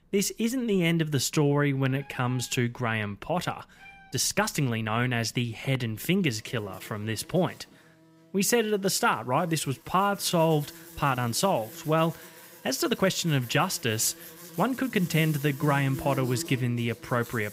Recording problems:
animal sounds; noticeable; throughout; 15 dB below the speech
uneven, jittery; strongly; from 1.5 to 15 s

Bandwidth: 15.5 kHz